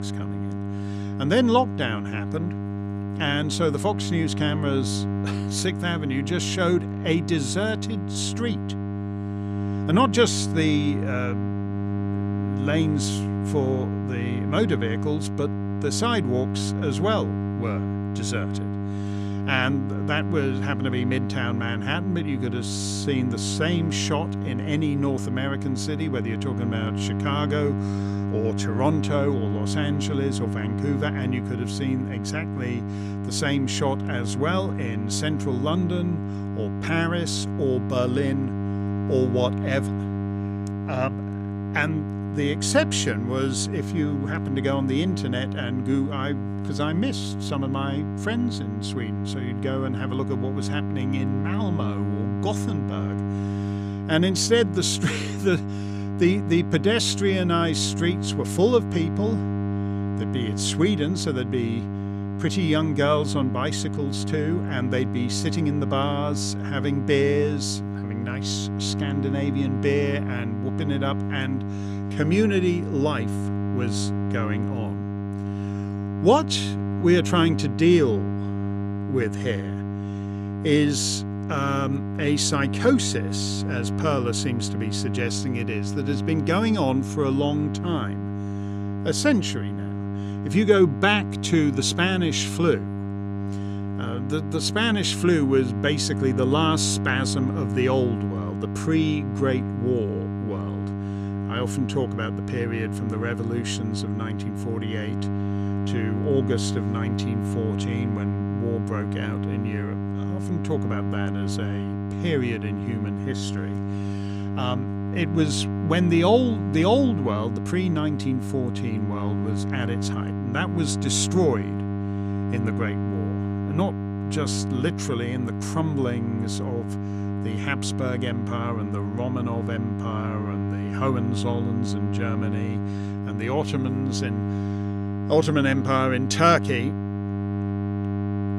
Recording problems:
electrical hum; loud; throughout; 50 Hz, 8 dB below the speech

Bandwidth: 15 kHz